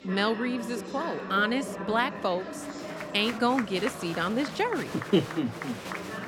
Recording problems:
murmuring crowd; loud; throughout; 8 dB below the speech

